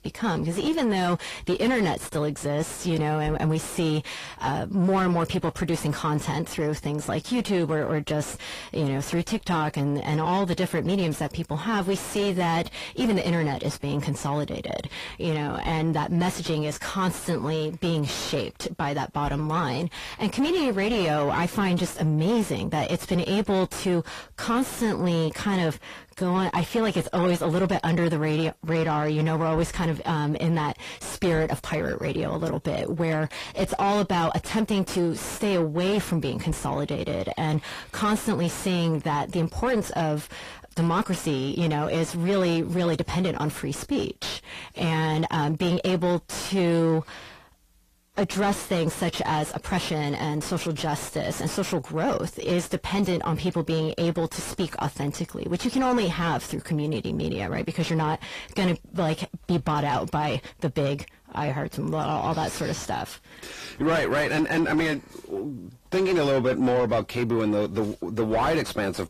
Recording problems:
distortion; heavy; 6 dB below the speech
garbled, watery; slightly; nothing above 14.5 kHz

